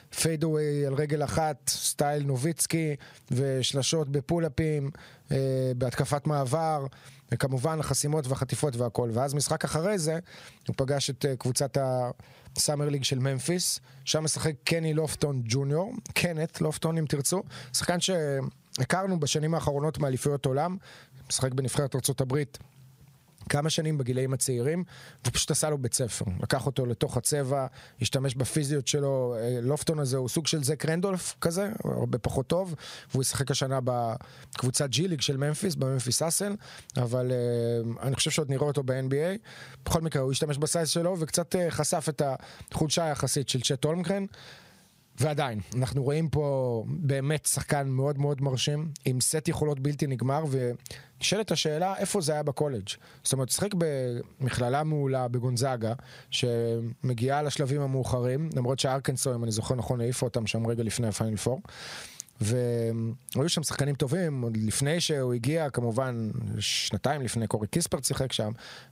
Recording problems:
squashed, flat; somewhat

